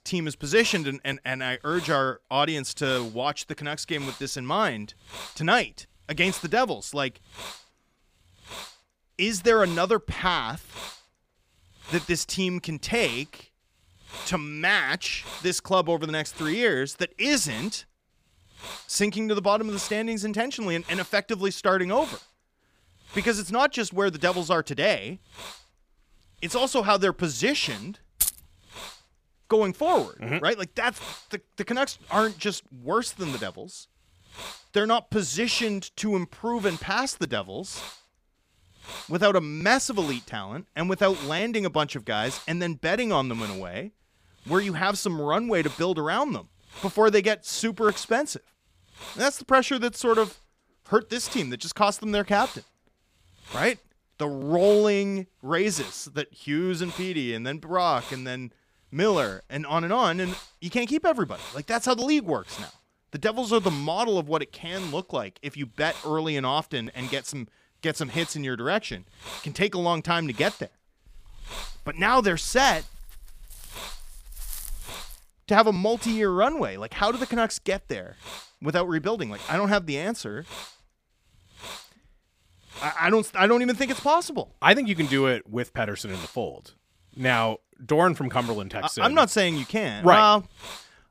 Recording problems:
hiss; noticeable; throughout; 15 dB below the speech
jangling keys; loud; at 28 s; peak level with the speech
dog barking; faint; from 1:11 to 1:15; peak 10 dB below the speech

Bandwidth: 15 kHz